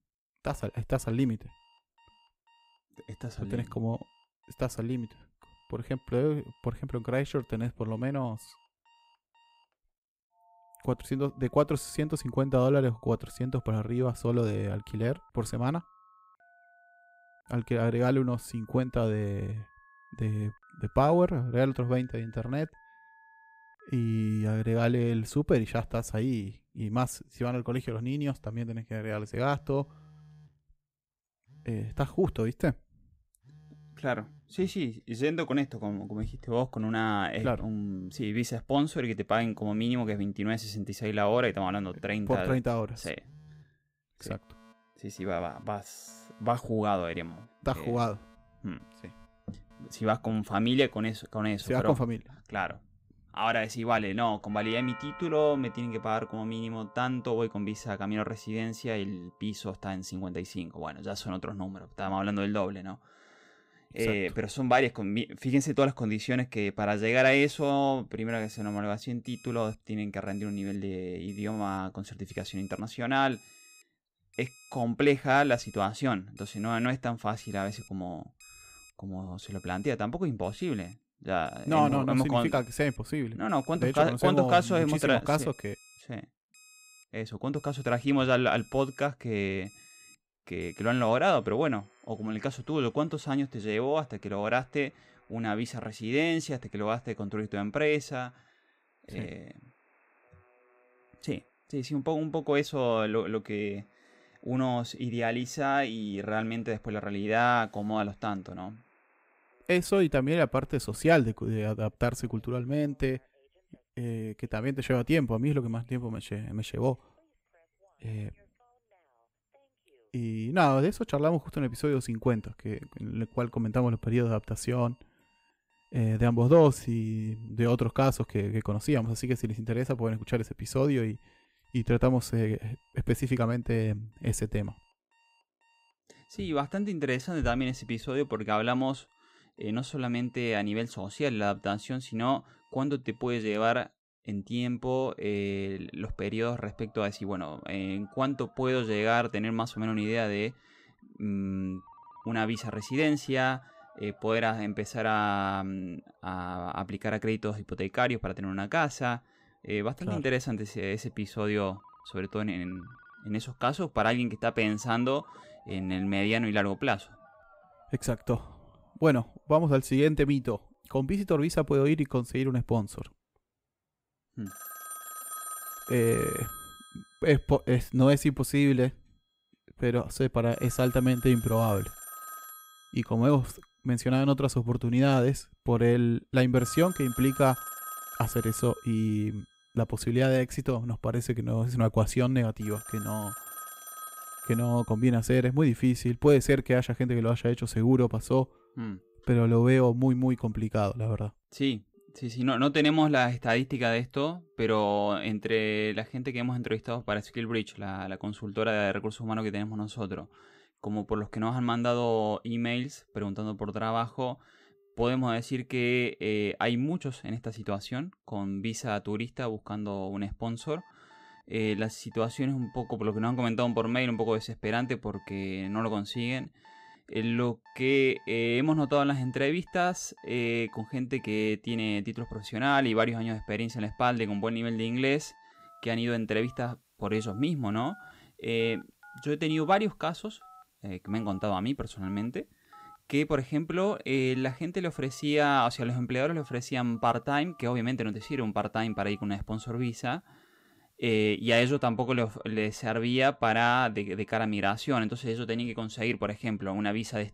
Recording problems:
alarms or sirens; noticeable; throughout; 20 dB below the speech

